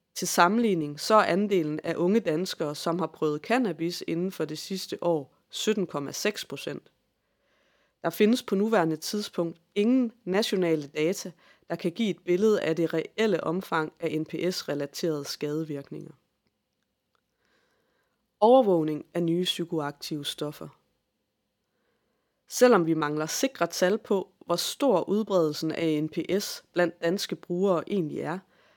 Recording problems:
none

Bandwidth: 17.5 kHz